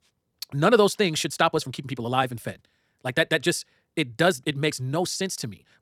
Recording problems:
wrong speed, natural pitch; too fast; 1.5 times normal speed

